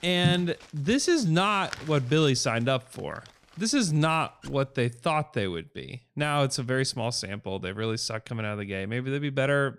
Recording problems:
household noises; faint; until 5 s; 20 dB below the speech

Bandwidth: 15.5 kHz